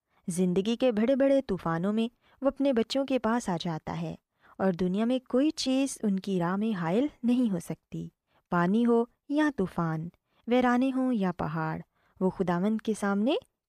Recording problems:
none

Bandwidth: 14.5 kHz